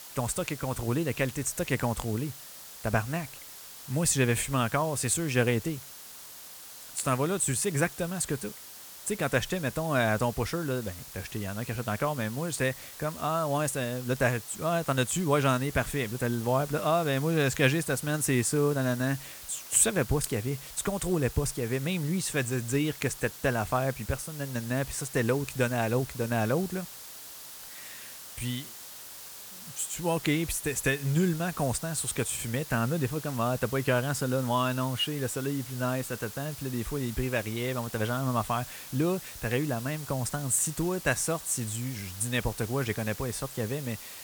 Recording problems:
hiss; noticeable; throughout; 10 dB below the speech

